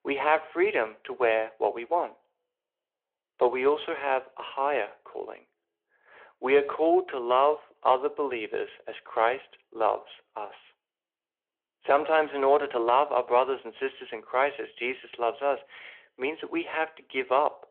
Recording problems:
phone-call audio

